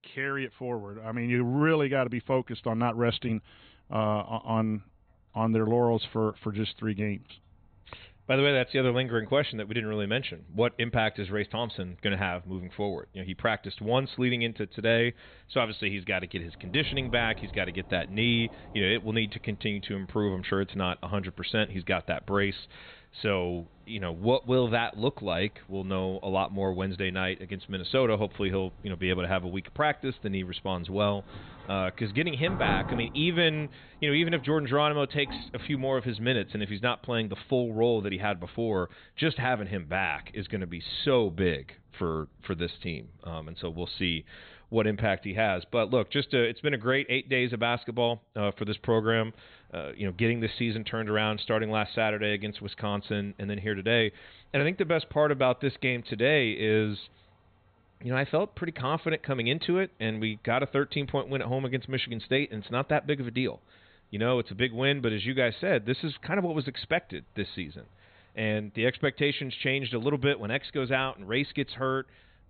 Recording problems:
high frequencies cut off; severe; nothing above 4 kHz
rain or running water; noticeable; throughout; 20 dB below the speech

